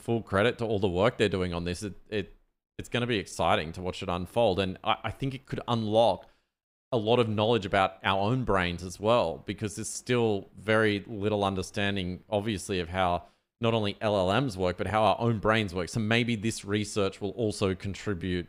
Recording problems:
none

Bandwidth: 15.5 kHz